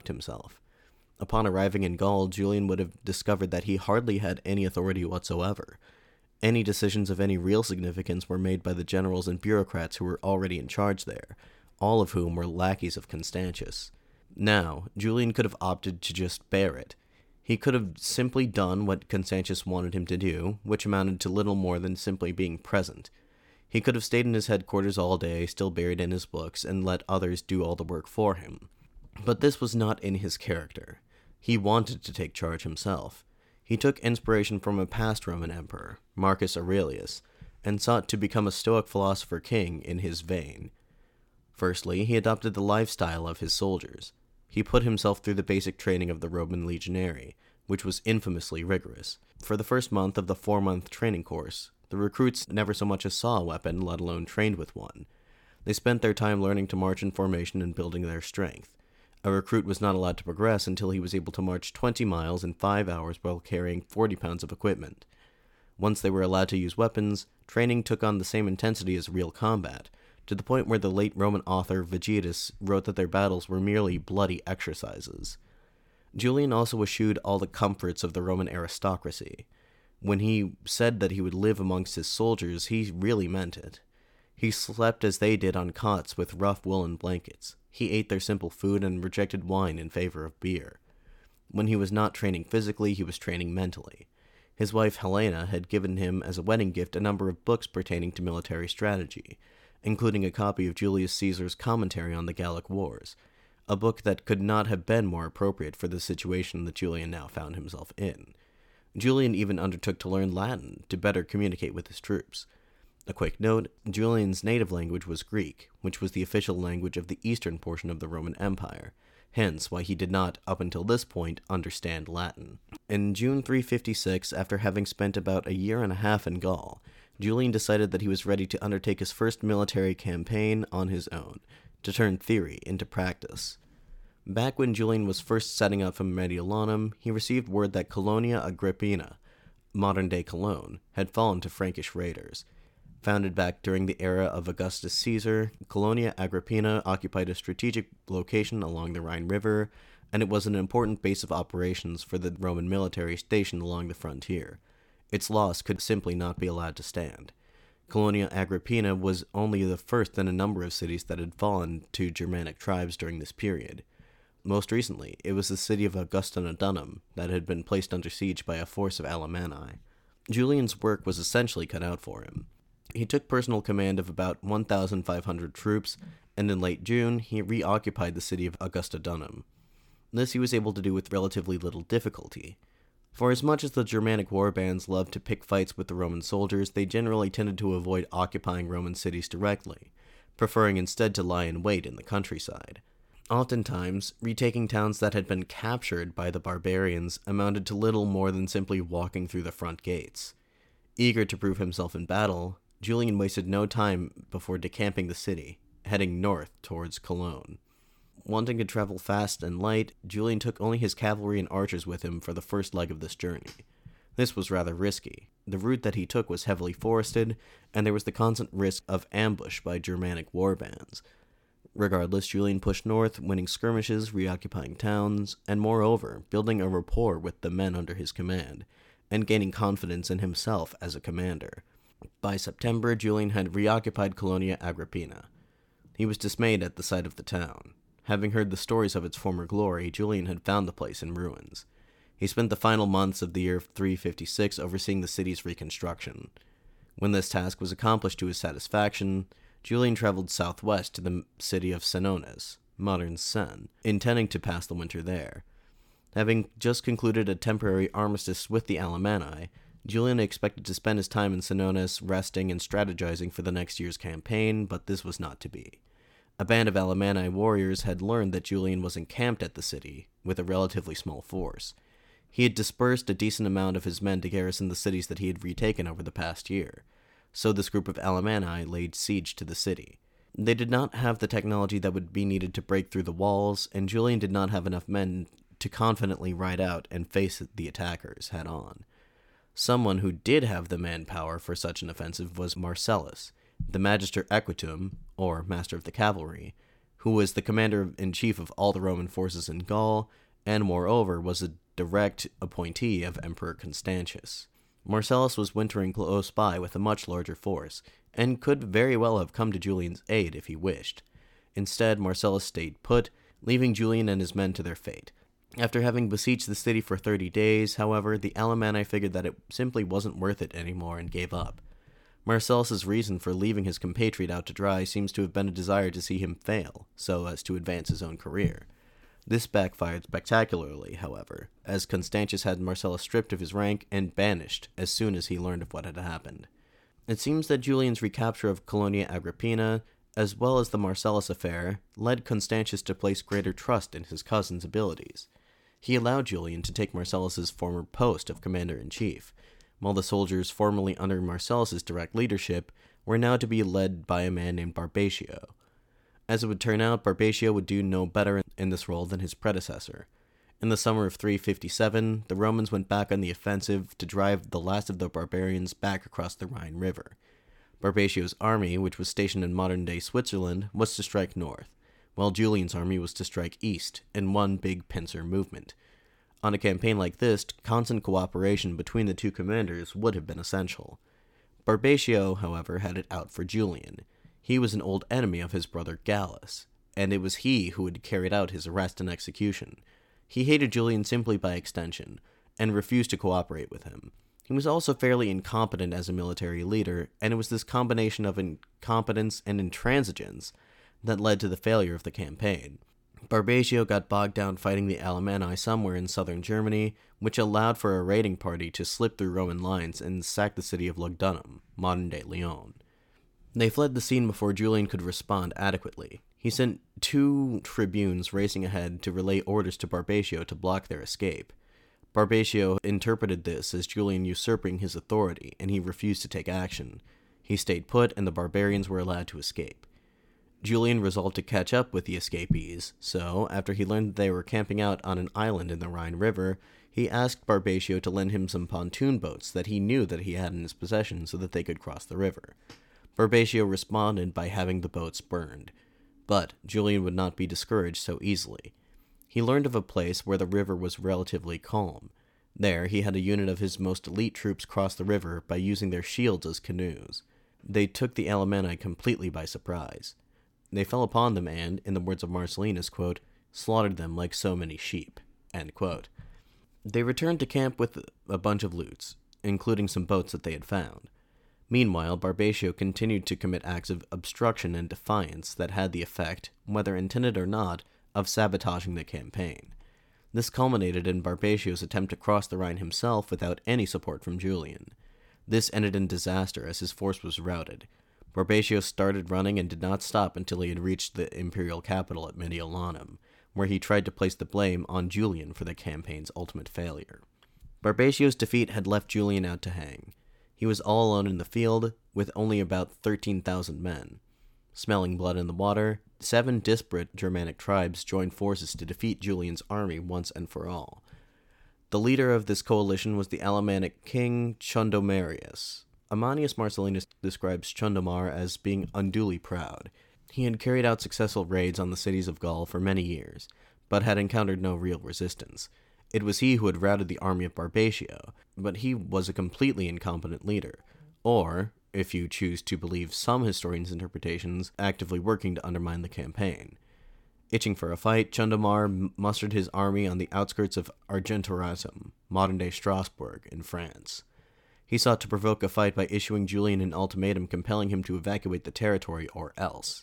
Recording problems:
none

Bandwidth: 17.5 kHz